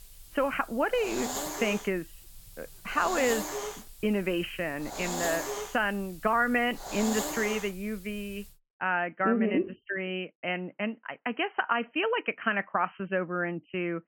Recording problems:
high frequencies cut off; severe; nothing above 3 kHz
hiss; loud; until 8.5 s; 5 dB below the speech

